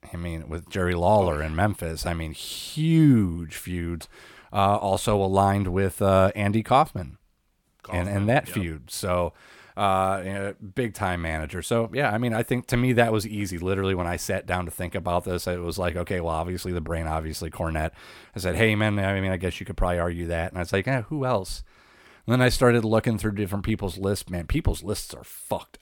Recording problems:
none

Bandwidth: 17.5 kHz